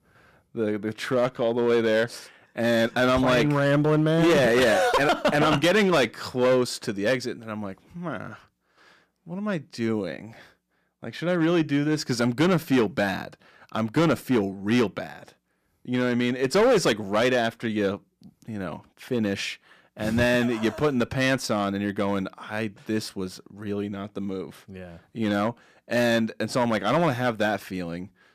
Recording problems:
distortion; slight; 5% of the sound clipped

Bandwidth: 14.5 kHz